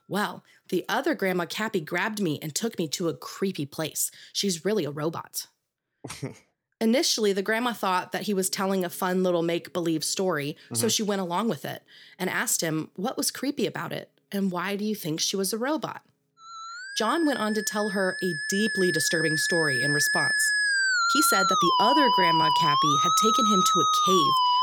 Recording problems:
background music; very loud; throughout; 4 dB above the speech
uneven, jittery; strongly; from 0.5 to 23 s

